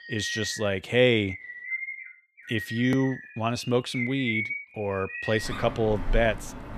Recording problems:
animal sounds; loud; throughout; 8 dB below the speech

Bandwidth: 14.5 kHz